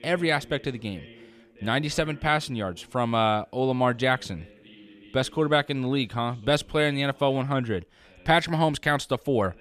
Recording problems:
voice in the background; faint; throughout; 25 dB below the speech

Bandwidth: 14.5 kHz